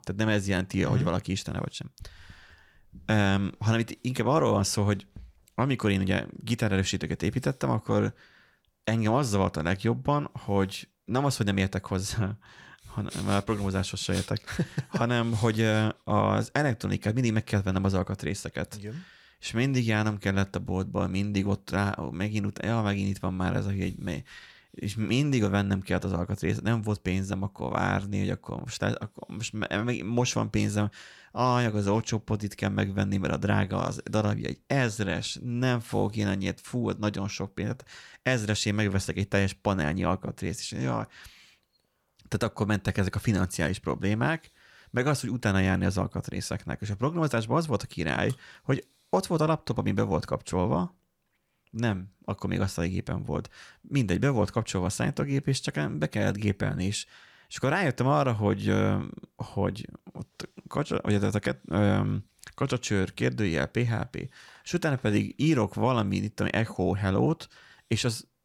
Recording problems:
none

